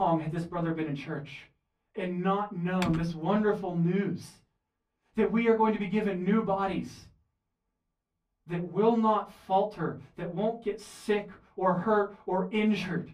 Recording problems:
off-mic speech; far
room echo; very slight; dies away in 0.3 s
abrupt cut into speech; at the start
keyboard typing; noticeable; at 3 s; peak 8 dB below the speech

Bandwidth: 15.5 kHz